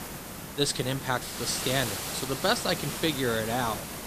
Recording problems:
hiss; loud; throughout; 5 dB below the speech

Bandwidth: 14.5 kHz